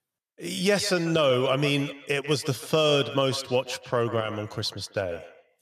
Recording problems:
echo of what is said; noticeable; throughout; 140 ms later, 15 dB below the speech

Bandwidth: 14.5 kHz